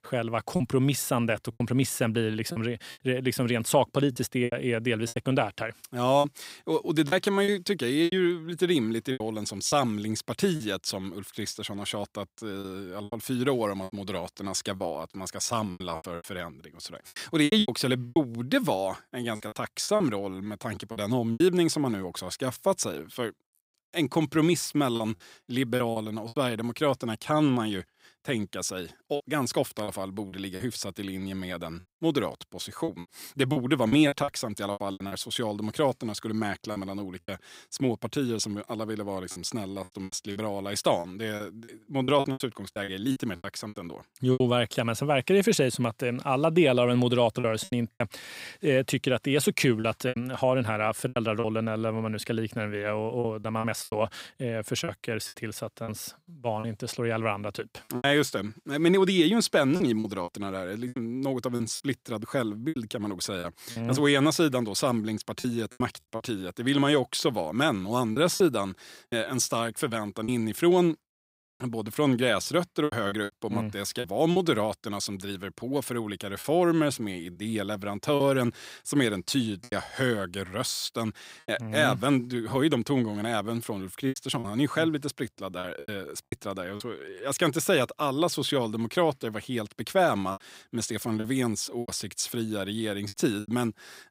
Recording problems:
choppy; very; 8% of the speech affected

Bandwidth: 15.5 kHz